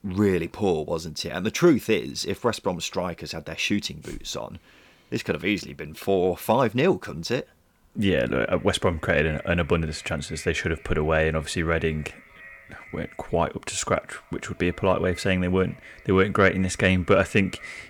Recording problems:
echo of what is said; faint; from 8 s on; 390 ms later, 20 dB below the speech

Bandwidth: 18.5 kHz